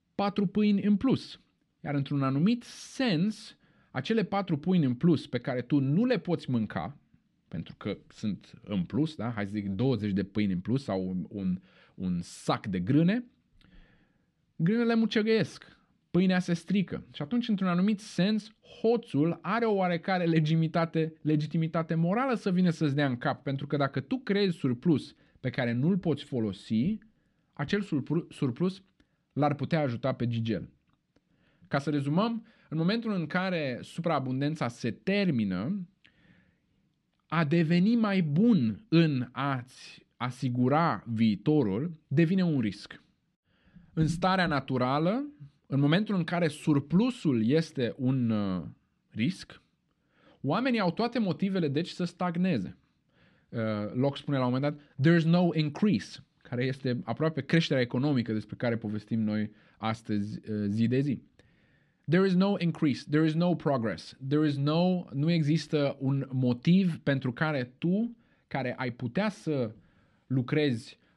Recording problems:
muffled; very slightly; fading above 3.5 kHz

